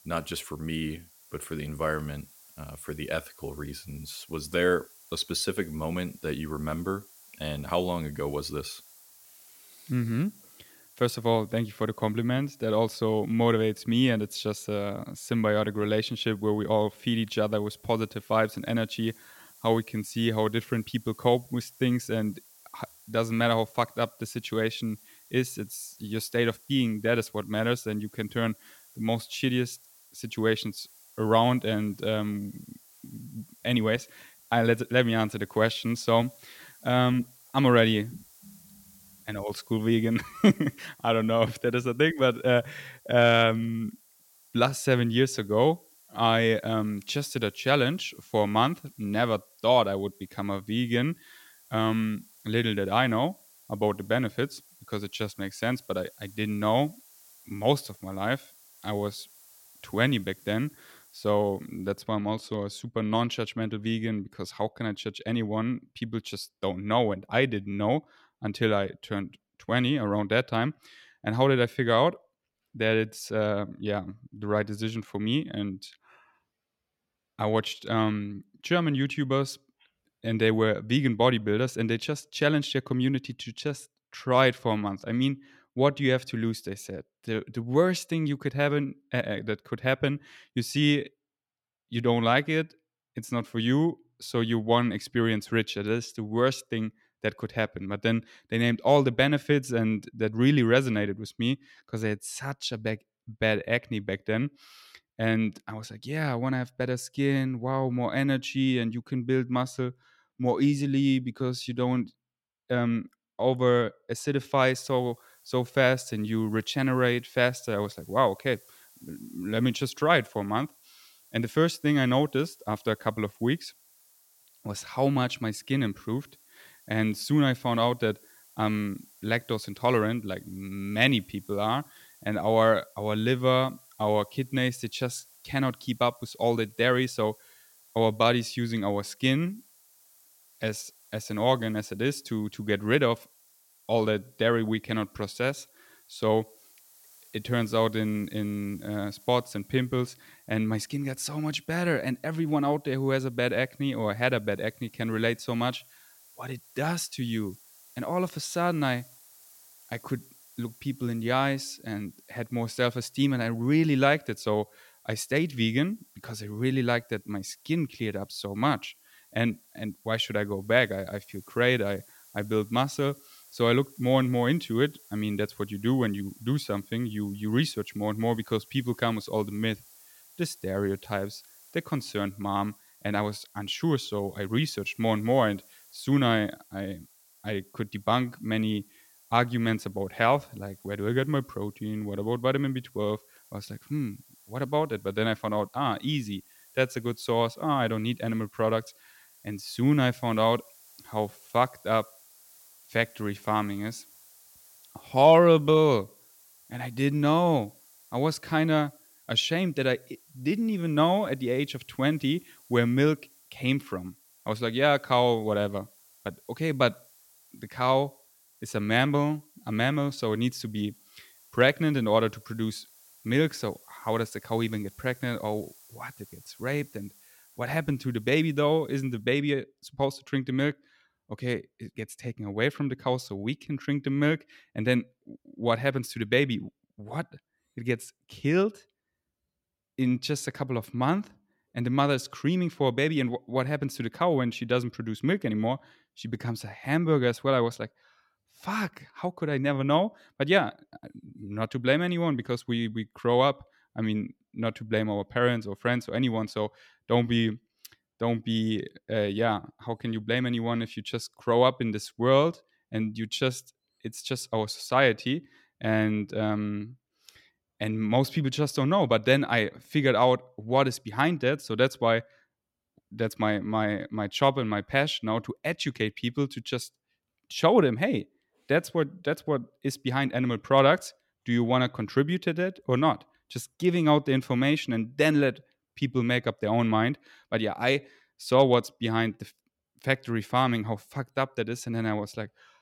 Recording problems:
hiss; faint; until 1:02 and from 1:55 to 3:49; 25 dB below the speech

